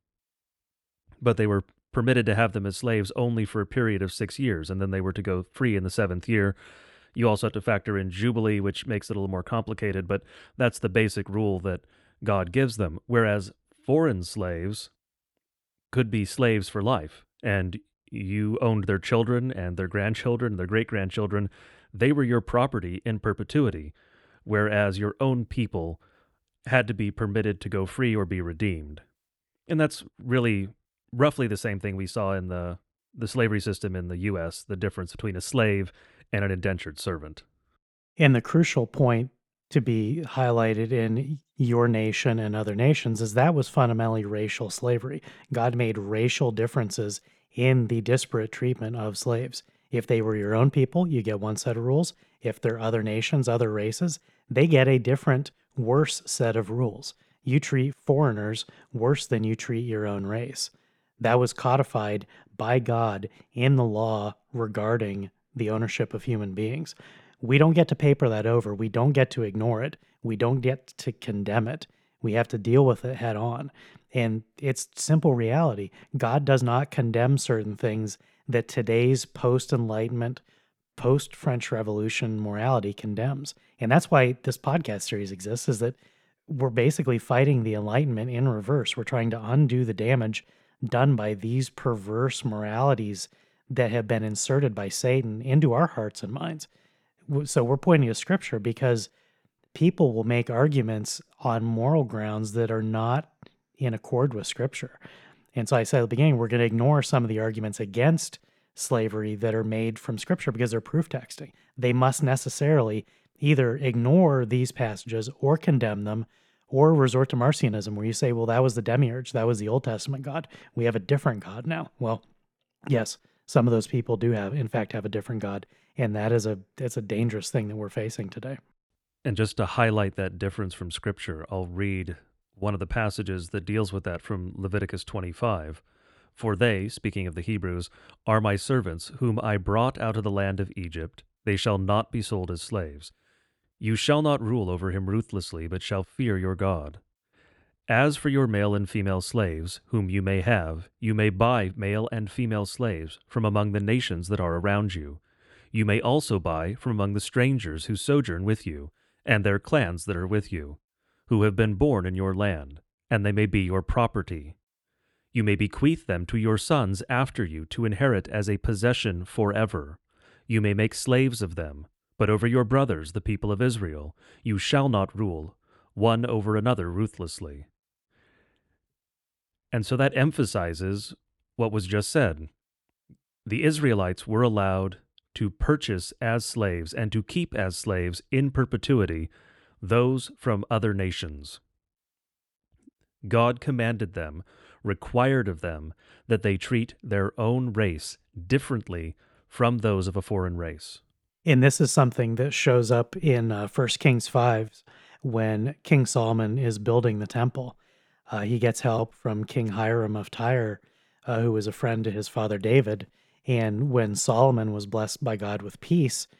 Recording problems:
none

